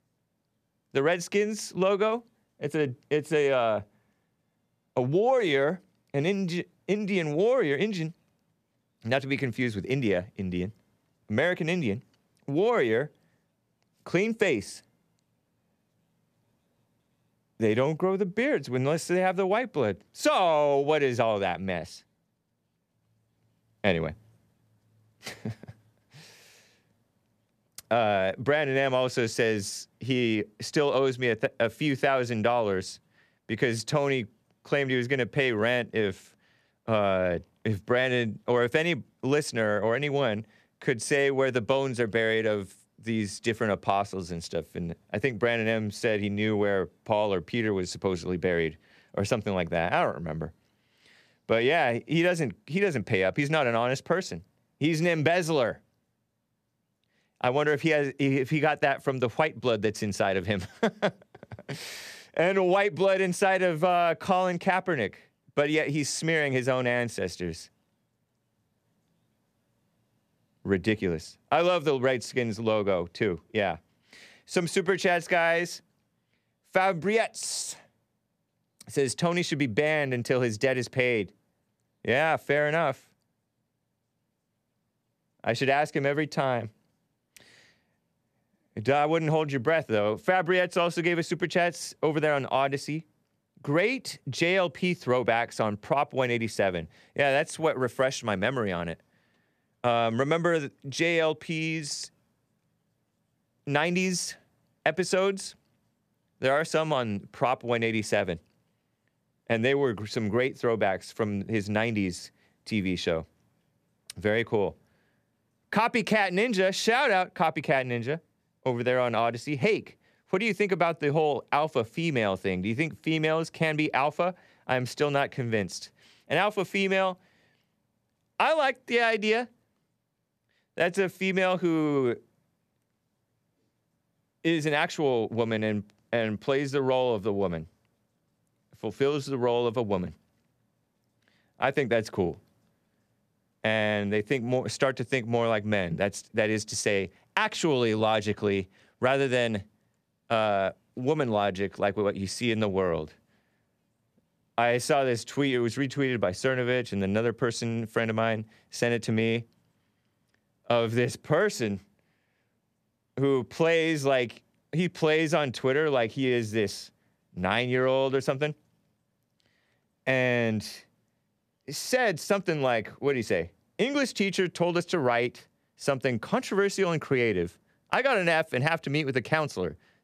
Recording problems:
none

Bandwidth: 14.5 kHz